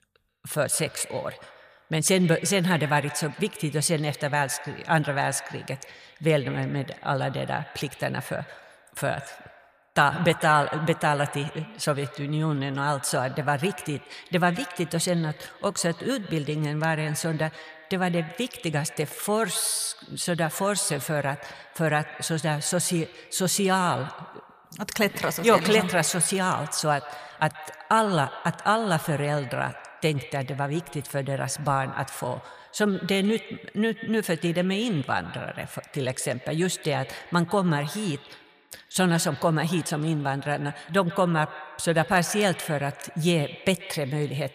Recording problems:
echo of what is said; noticeable; throughout; 130 ms later, 15 dB below the speech

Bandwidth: 14.5 kHz